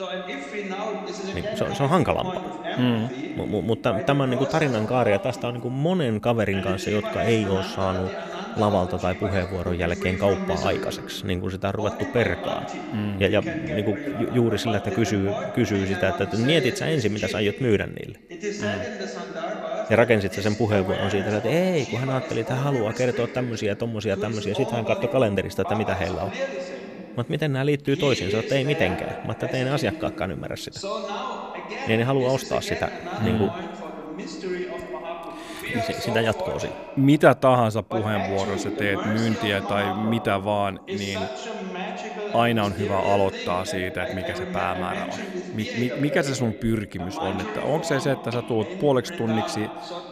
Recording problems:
voice in the background; loud; throughout; 7 dB below the speech

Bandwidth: 14.5 kHz